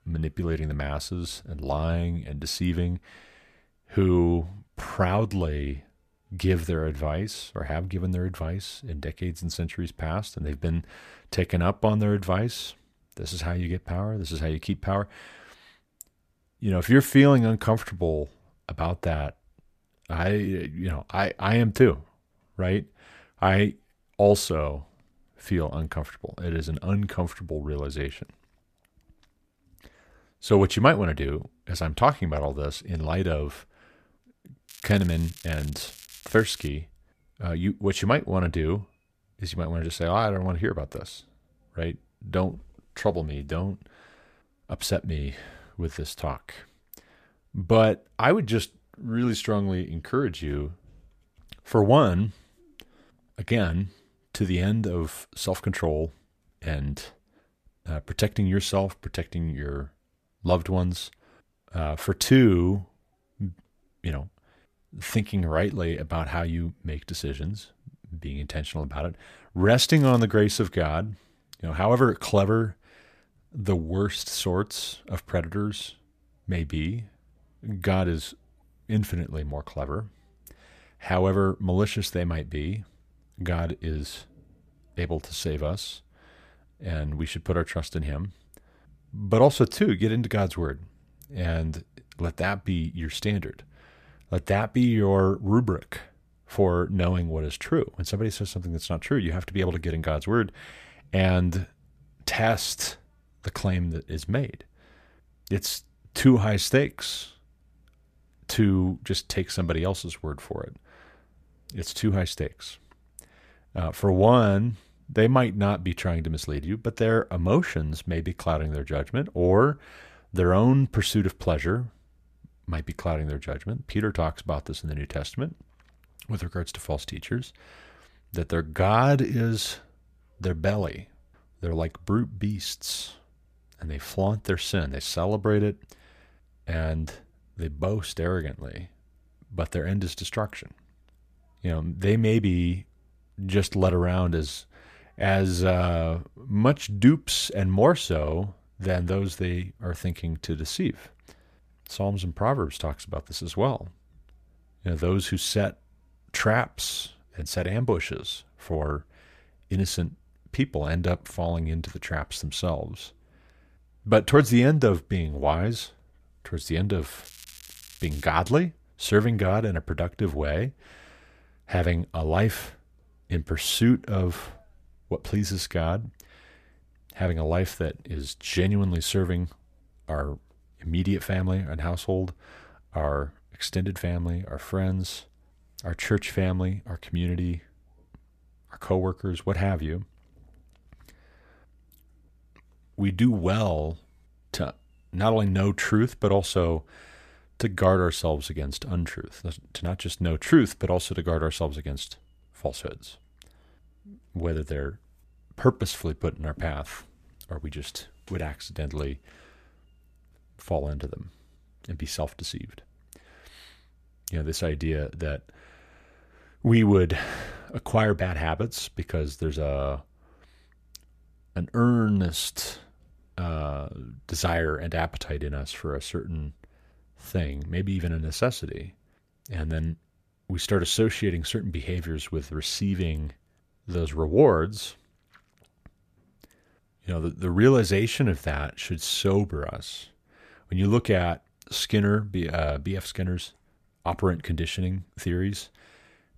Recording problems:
crackling; noticeable; from 35 to 37 s, at 1:10 and from 2:47 to 2:48; 20 dB below the speech

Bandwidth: 14.5 kHz